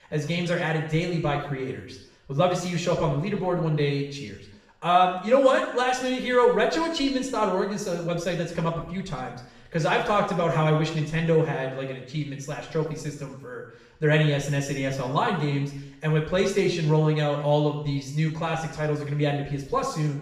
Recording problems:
off-mic speech; far
room echo; noticeable; dies away in 0.7 s

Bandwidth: 14.5 kHz